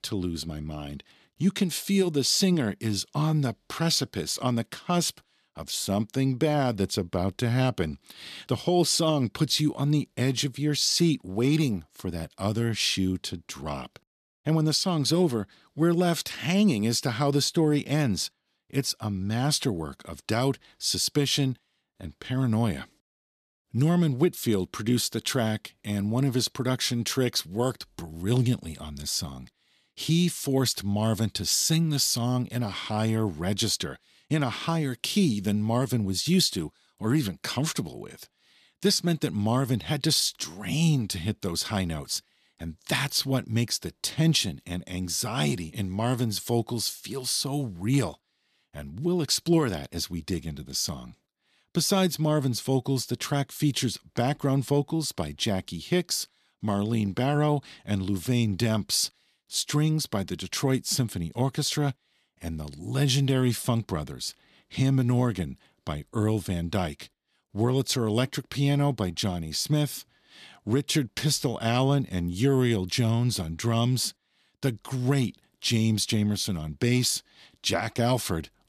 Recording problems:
none

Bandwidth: 14 kHz